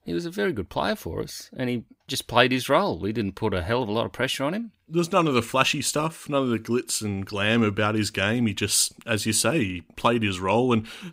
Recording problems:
none

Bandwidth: 15.5 kHz